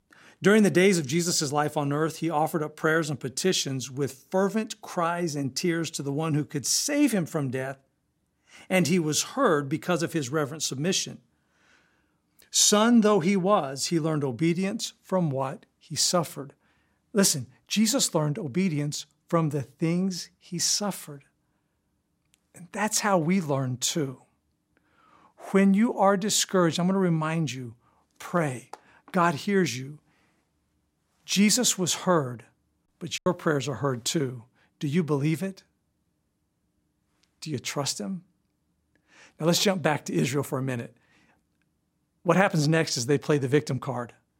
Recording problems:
choppy; very; at 33 s; 10% of the speech affected

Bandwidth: 16 kHz